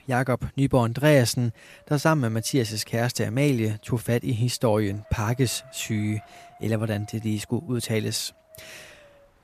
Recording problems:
wind noise on the microphone; occasional gusts; 25 dB below the speech

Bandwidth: 14.5 kHz